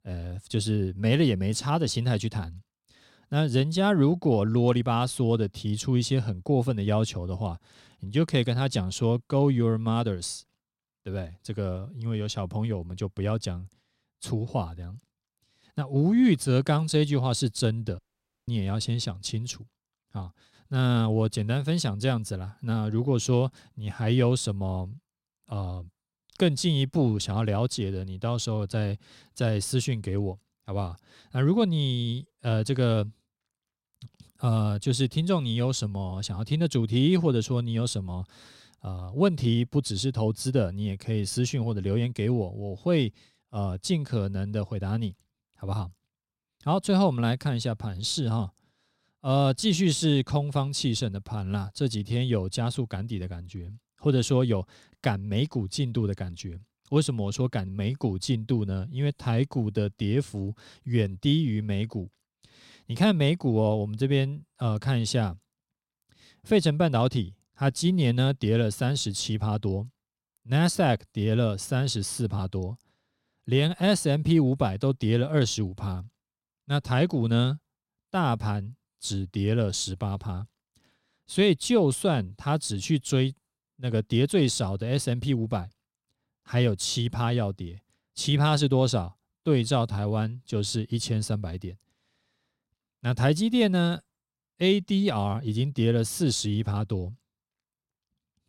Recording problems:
audio cutting out; at 18 s

